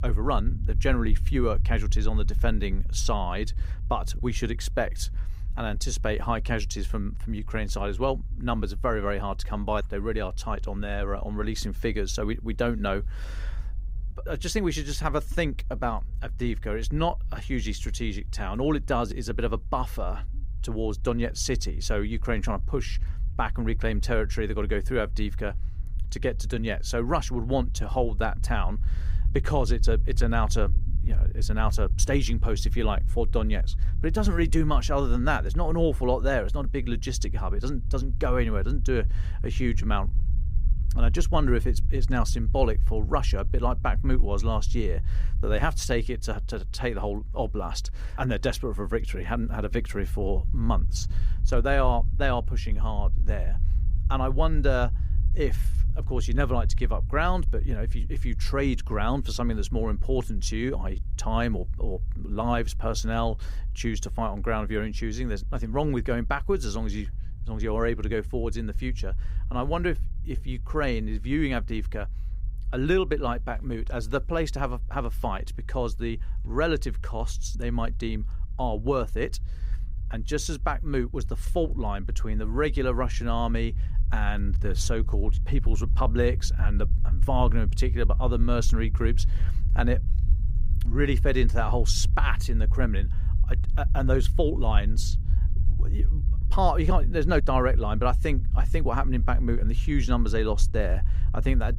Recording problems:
low rumble; faint; throughout; 20 dB below the speech

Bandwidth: 15.5 kHz